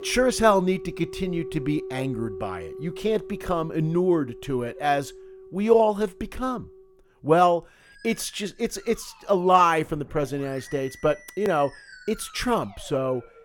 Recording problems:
background music; noticeable; throughout; 15 dB below the speech

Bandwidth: 17.5 kHz